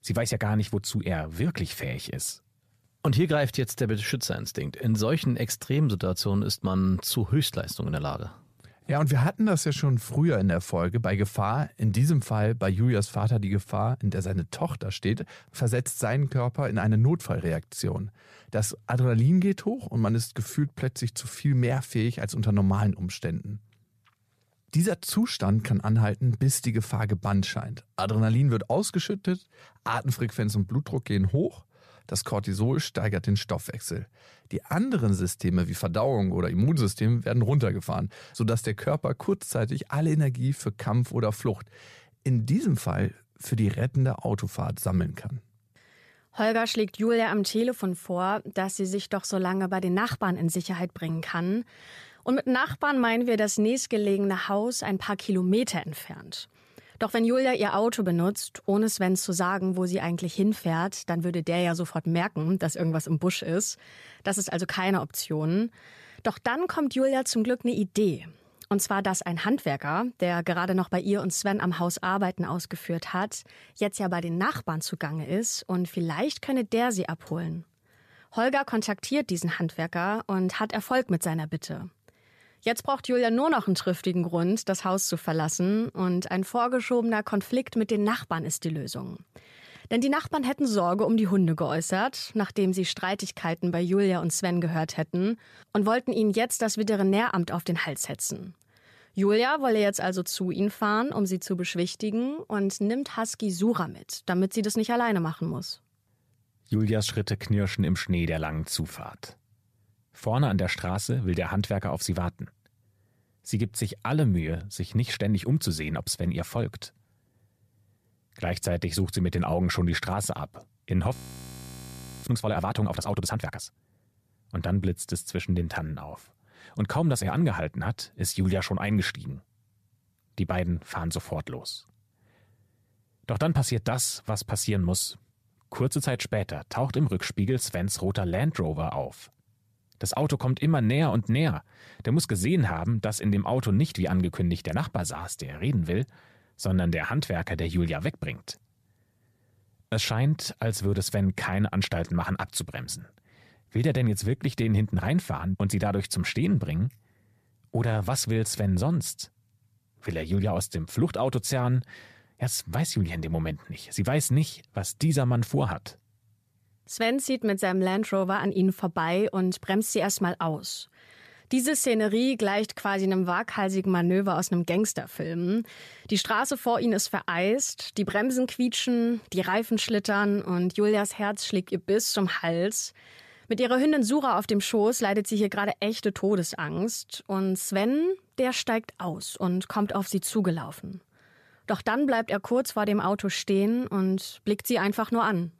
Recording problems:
audio freezing; at 2:01 for 1 s

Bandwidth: 14.5 kHz